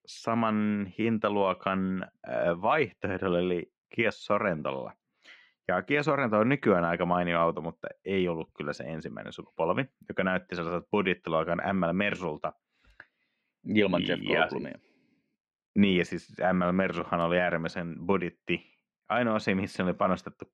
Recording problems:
muffled; slightly; fading above 3 kHz

